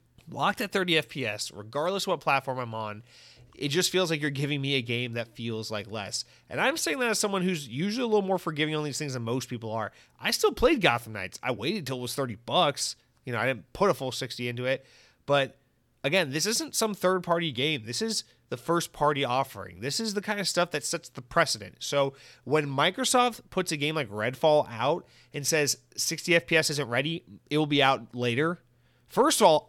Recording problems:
none

